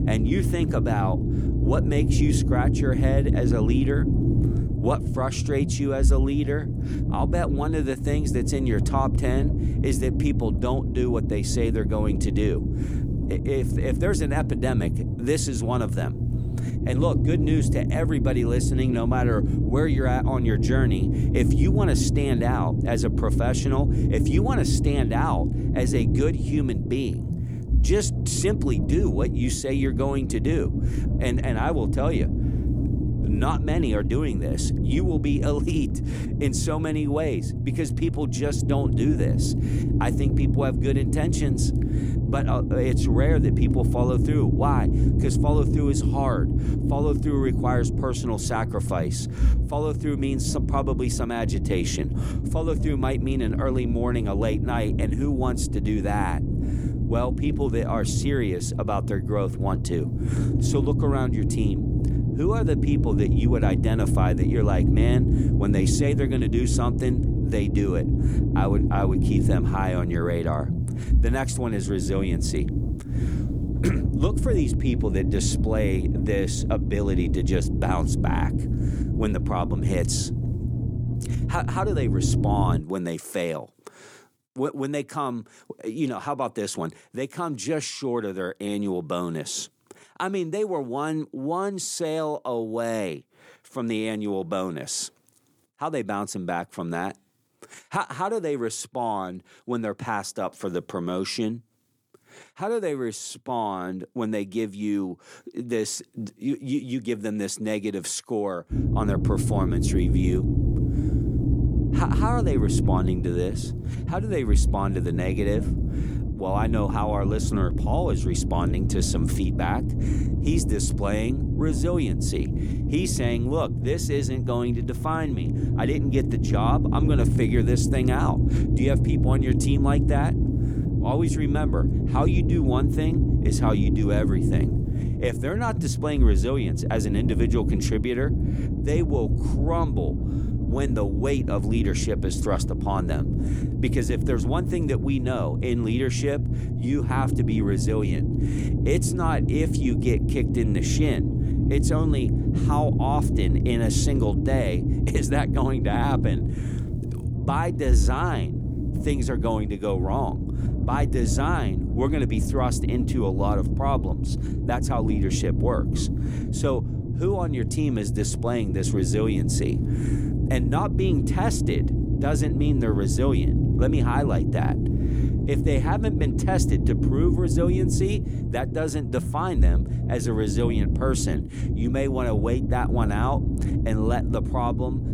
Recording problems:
low rumble; loud; until 1:23 and from 1:49 on; 5 dB below the speech

